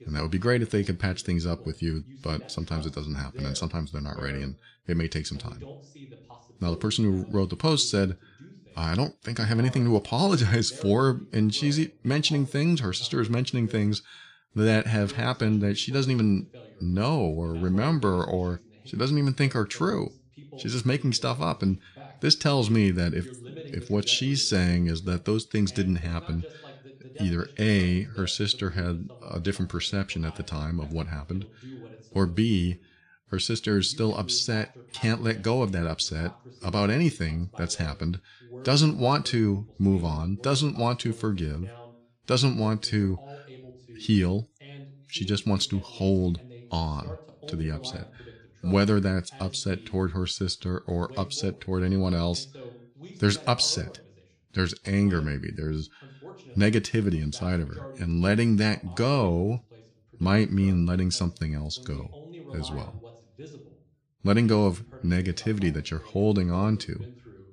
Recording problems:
voice in the background; faint; throughout; 20 dB below the speech

